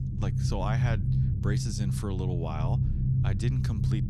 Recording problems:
low rumble; loud; throughout; 2 dB below the speech

